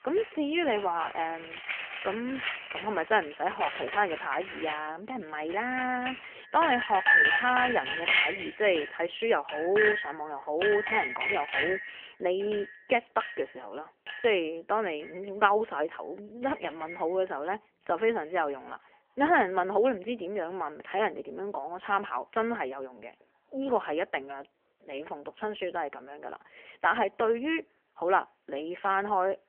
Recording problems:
phone-call audio; nothing above 3 kHz
household noises; loud; throughout; as loud as the speech

